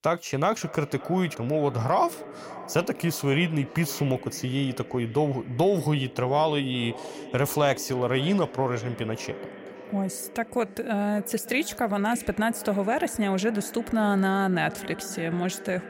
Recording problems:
echo of what is said; noticeable; throughout; 560 ms later, 15 dB below the speech

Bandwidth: 16 kHz